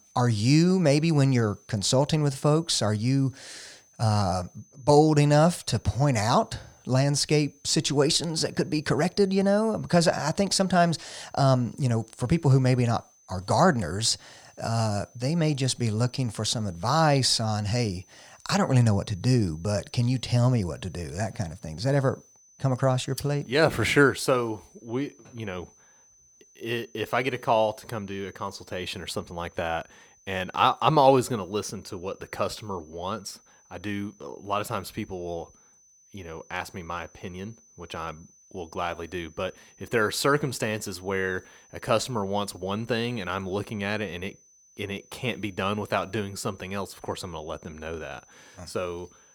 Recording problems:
high-pitched whine; faint; throughout; 6 kHz, 30 dB below the speech

